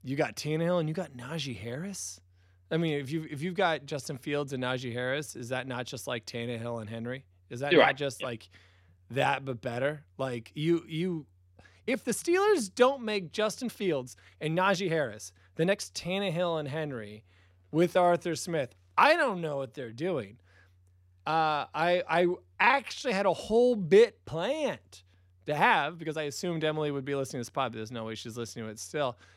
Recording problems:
uneven, jittery; strongly; from 4 to 26 s

